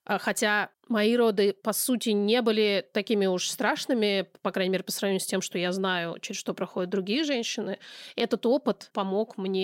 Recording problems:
abrupt cut into speech; at the end

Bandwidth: 16 kHz